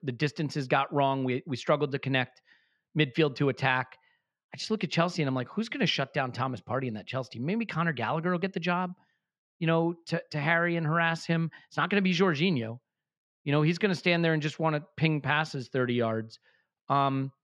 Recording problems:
muffled; slightly; fading above 3 kHz

